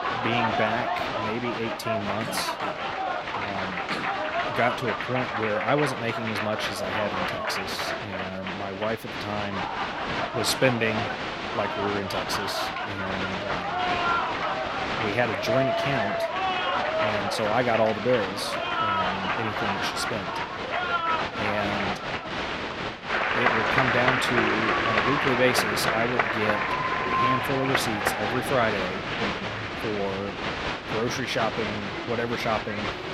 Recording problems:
crowd noise; very loud; throughout; 2 dB above the speech

